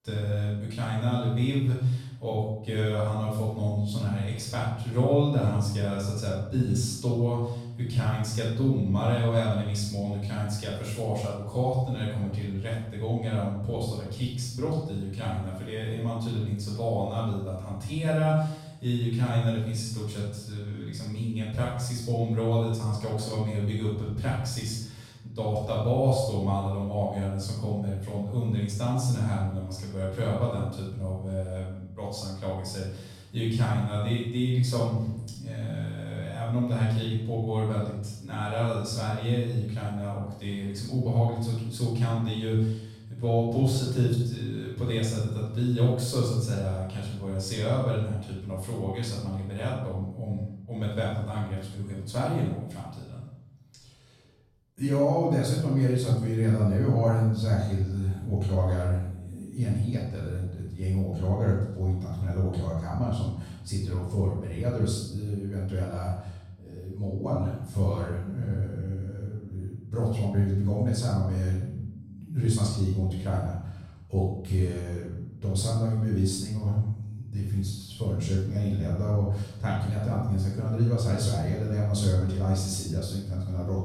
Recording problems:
off-mic speech; far
room echo; noticeable; dies away in 0.7 s

